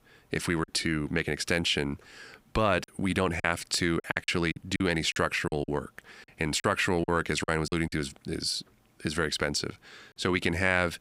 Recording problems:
choppy; very; 7% of the speech affected

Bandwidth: 15.5 kHz